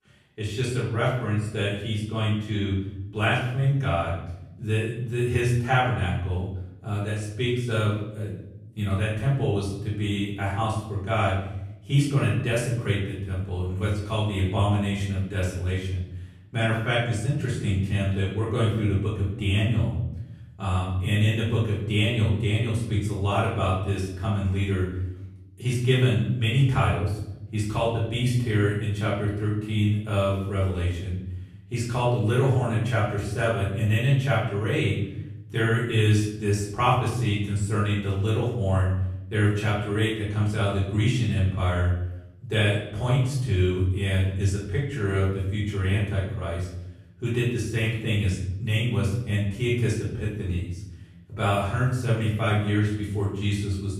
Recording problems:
off-mic speech; far
room echo; noticeable; dies away in 0.8 s

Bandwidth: 13.5 kHz